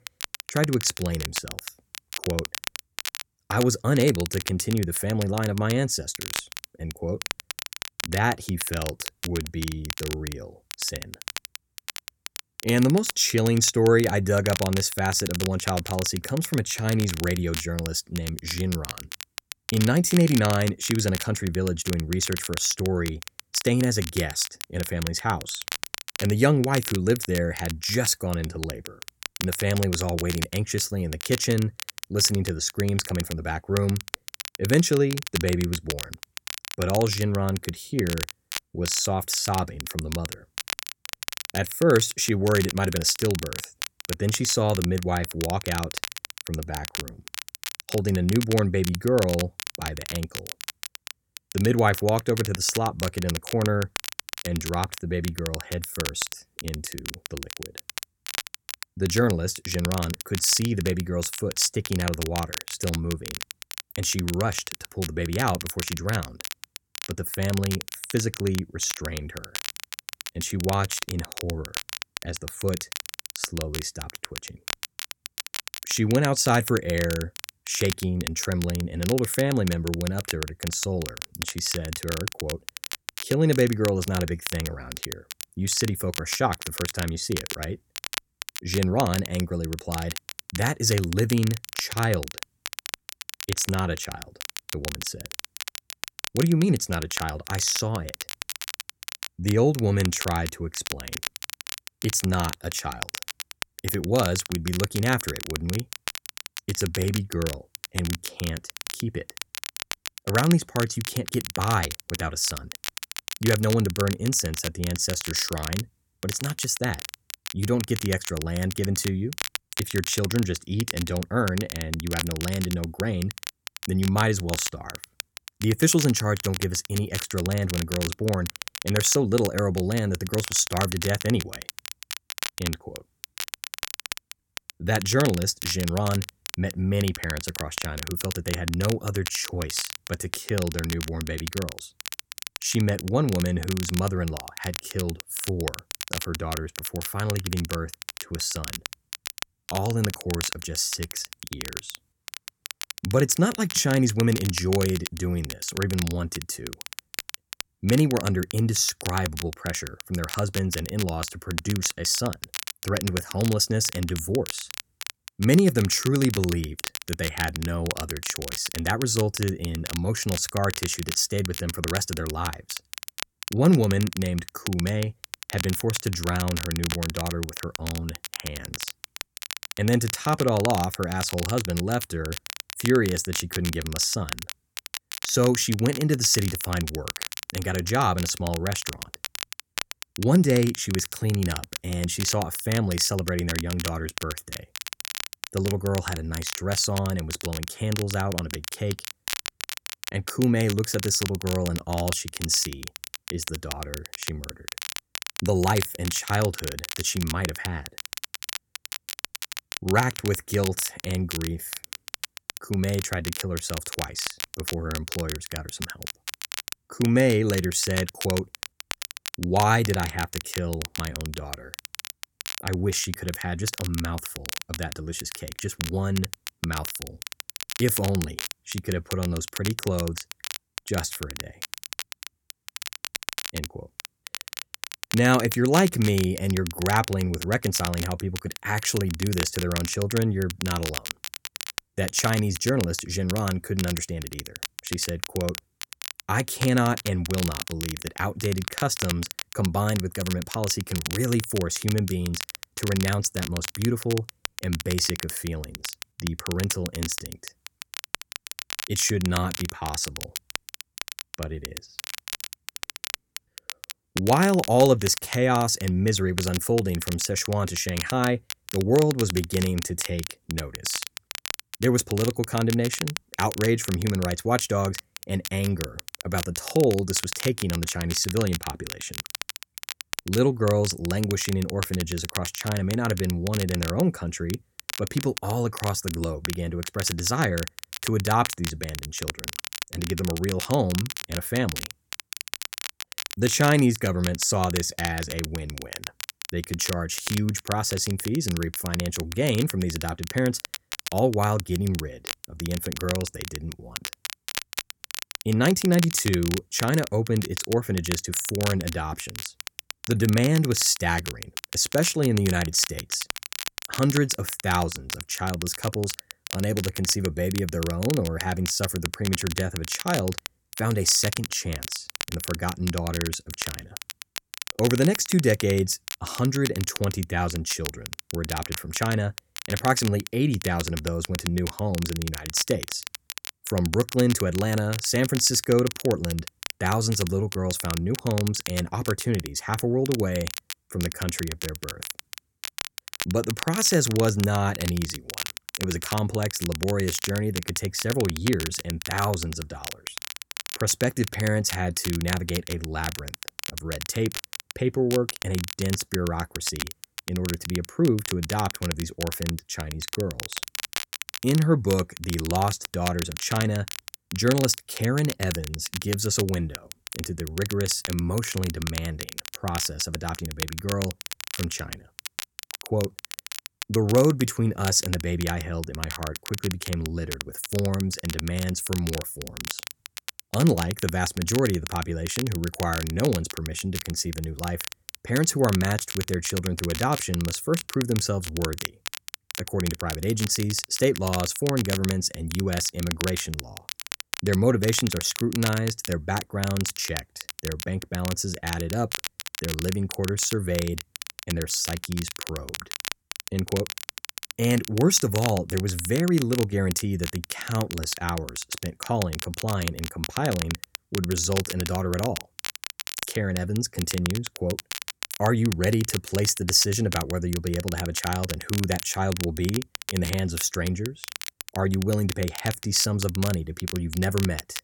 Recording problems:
crackle, like an old record; loud; 8 dB below the speech

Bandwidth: 17.5 kHz